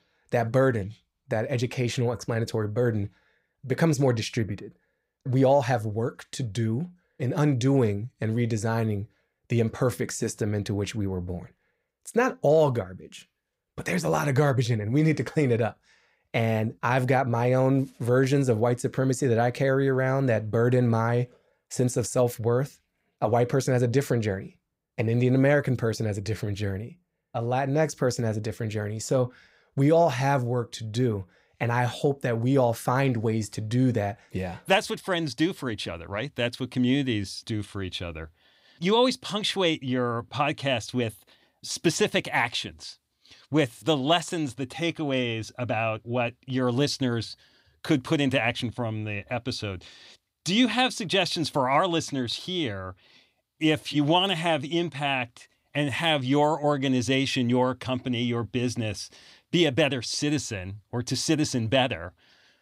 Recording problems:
none

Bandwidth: 15.5 kHz